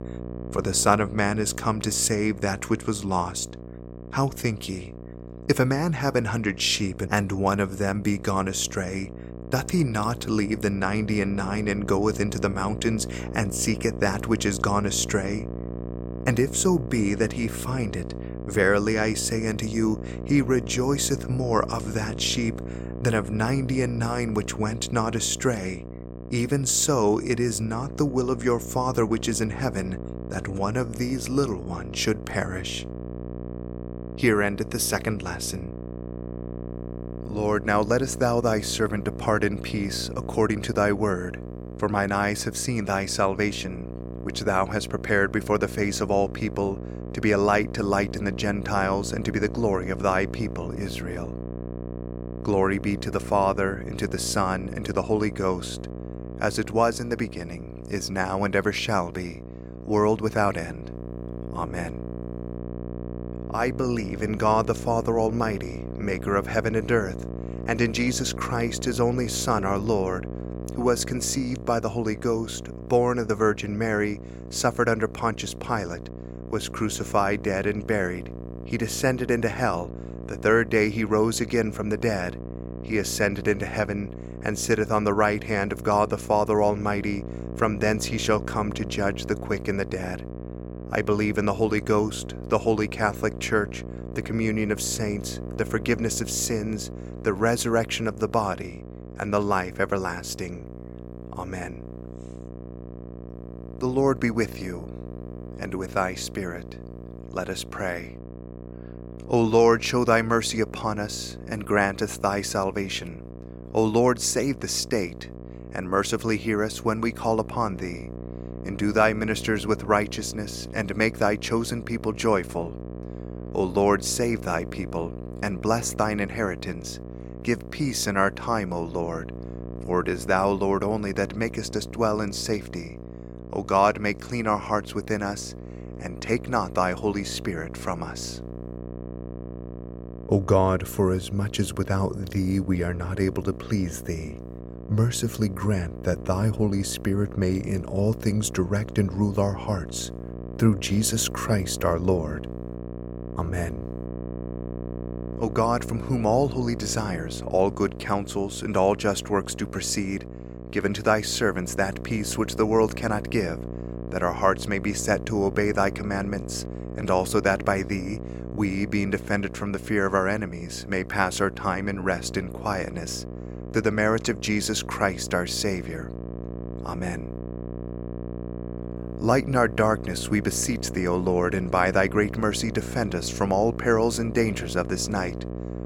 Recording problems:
electrical hum; noticeable; throughout; 60 Hz, 15 dB below the speech

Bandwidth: 16.5 kHz